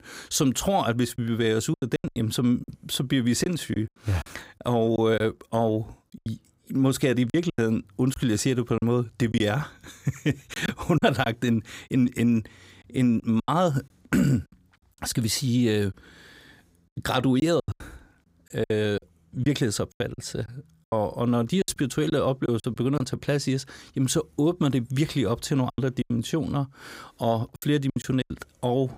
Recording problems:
choppy; very; 9% of the speech affected

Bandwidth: 15.5 kHz